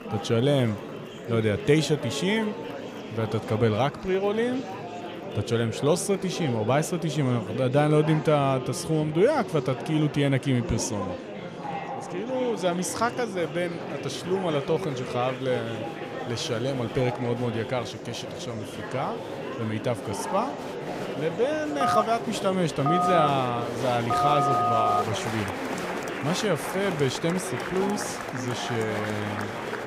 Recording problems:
murmuring crowd; loud; throughout; 7 dB below the speech
phone ringing; loud; from 22 to 25 s; peak 4 dB above the speech

